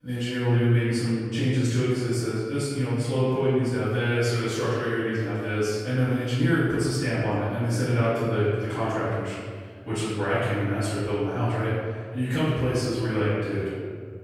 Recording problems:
room echo; strong; dies away in 1.6 s
off-mic speech; far

